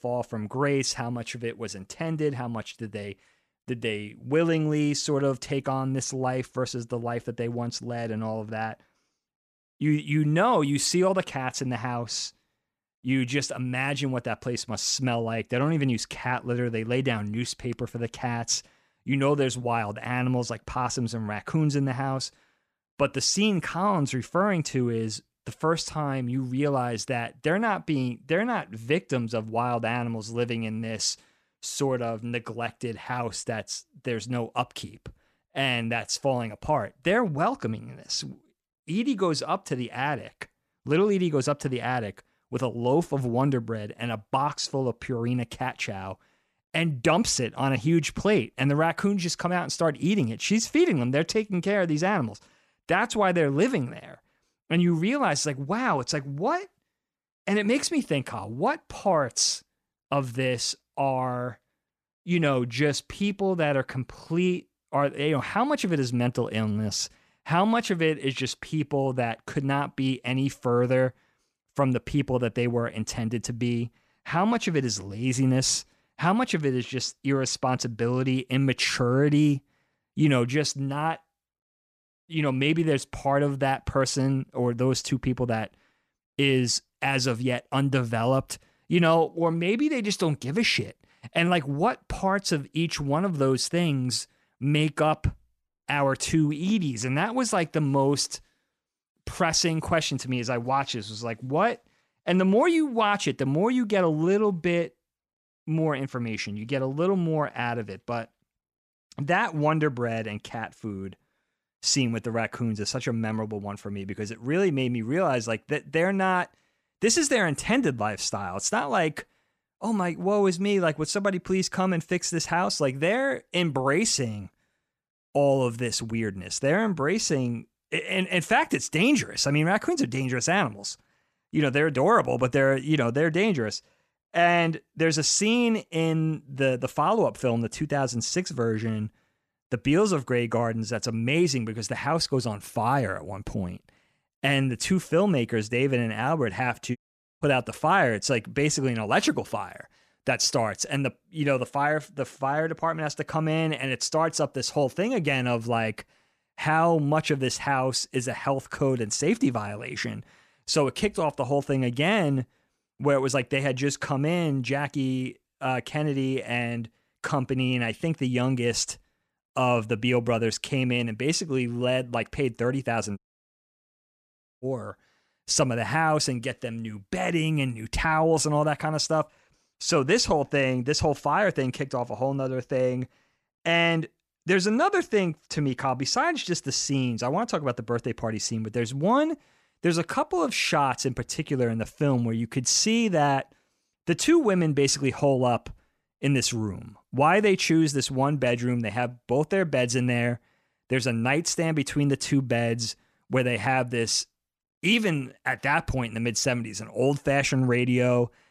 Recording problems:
audio cutting out; at 2:27 and at 2:53 for 1.5 s

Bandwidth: 14.5 kHz